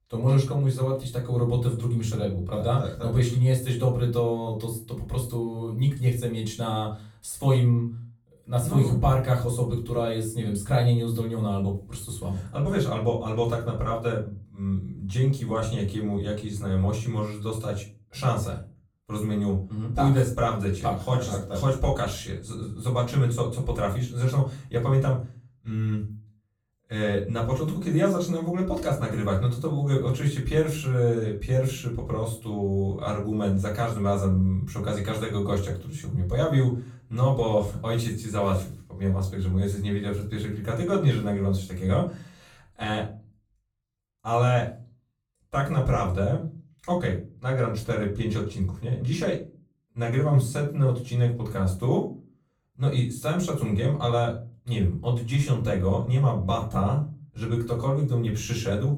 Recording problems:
off-mic speech; far
room echo; slight; dies away in 0.3 s

